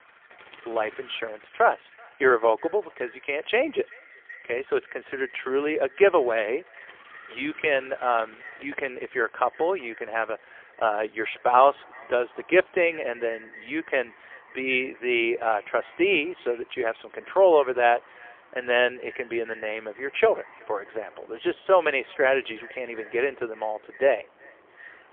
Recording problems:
phone-call audio; poor line; nothing above 3 kHz
echo of what is said; faint; throughout; 380 ms later, 25 dB below the speech
traffic noise; faint; throughout; 25 dB below the speech

